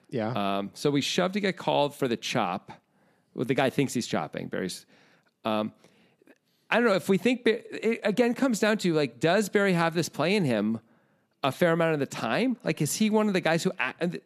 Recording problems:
none

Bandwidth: 14.5 kHz